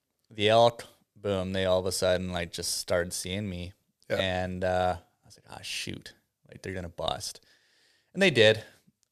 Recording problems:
none

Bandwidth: 14.5 kHz